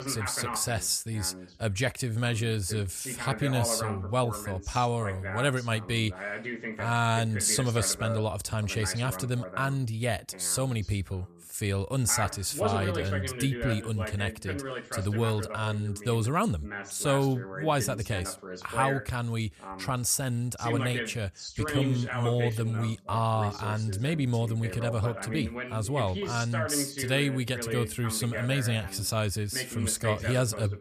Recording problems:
voice in the background; loud; throughout; 8 dB below the speech

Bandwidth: 14.5 kHz